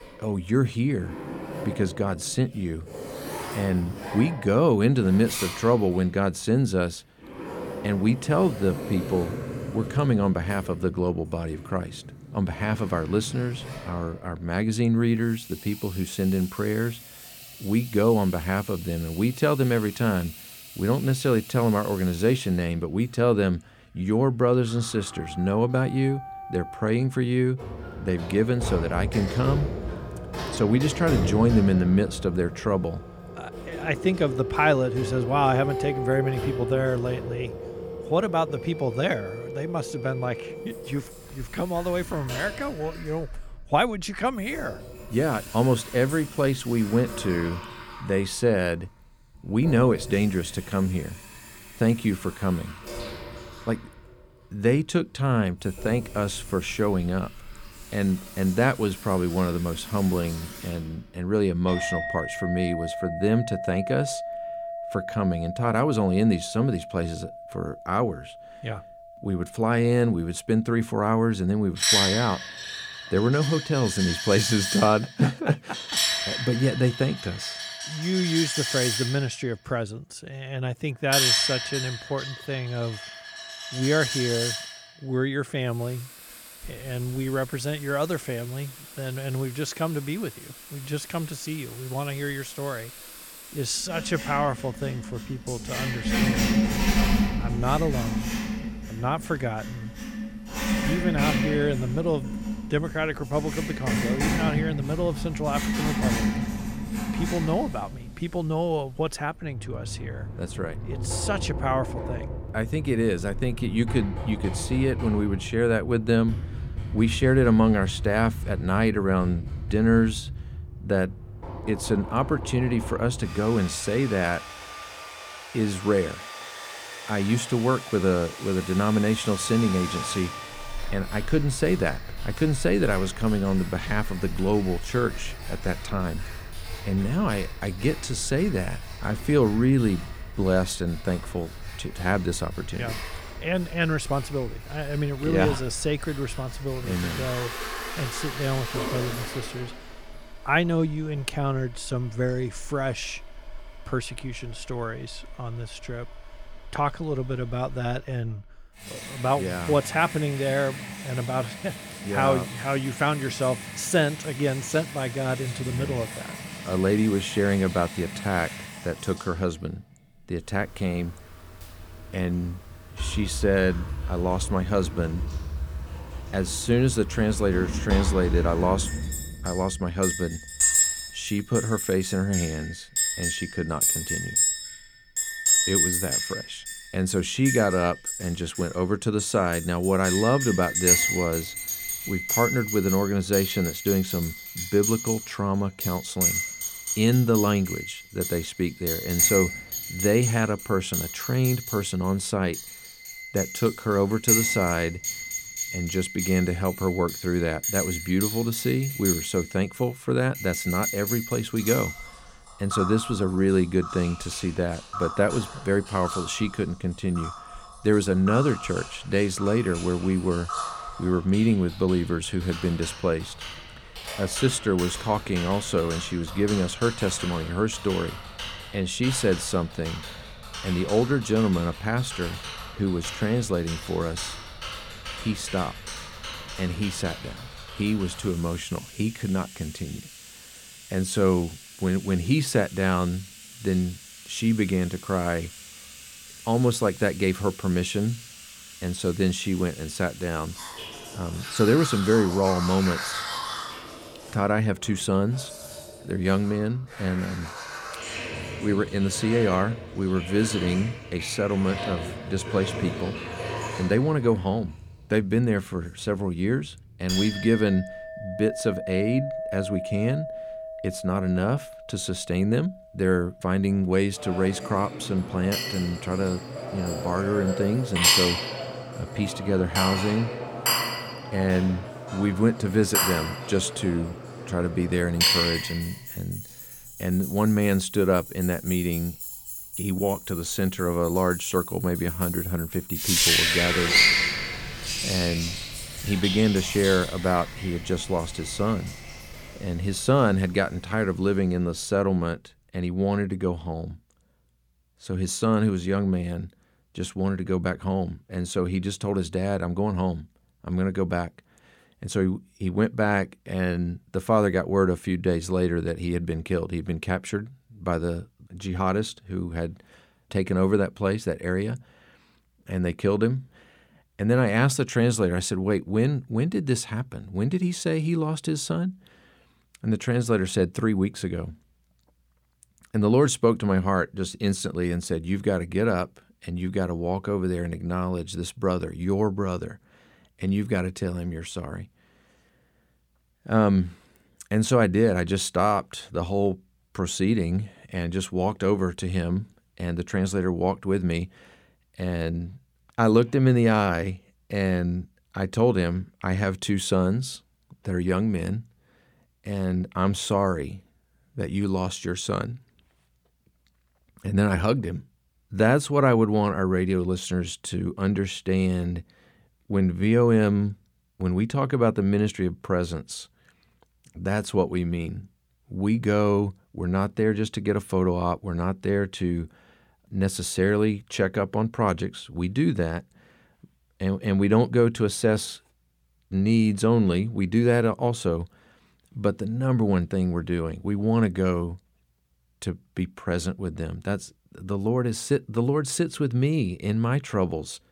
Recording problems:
household noises; loud; until 5:02; 5 dB below the speech

